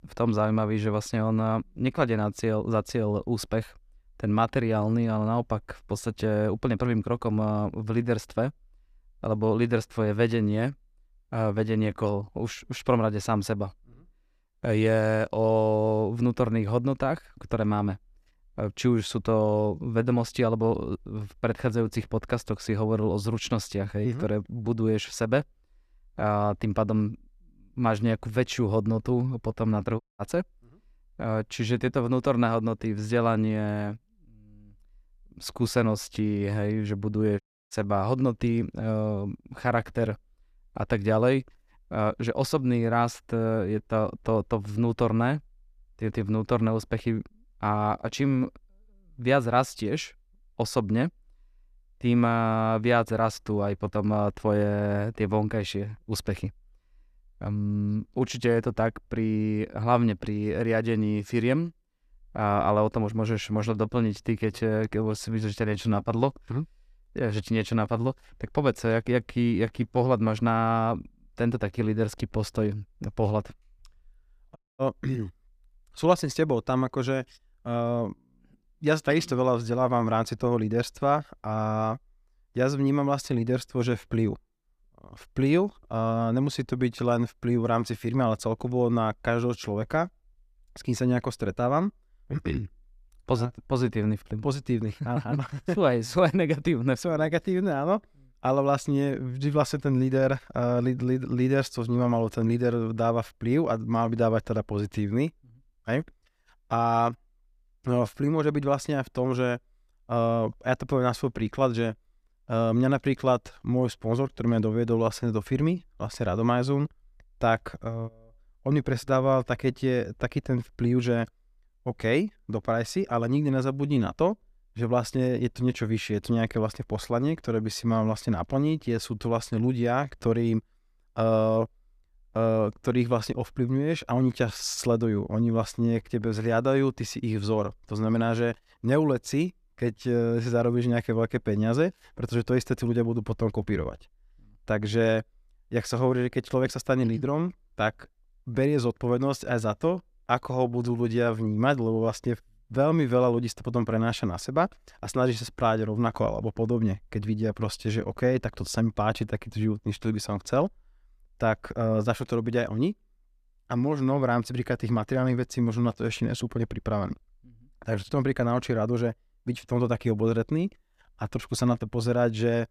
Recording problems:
audio cutting out; at 30 s, at 37 s and at 1:15

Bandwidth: 14.5 kHz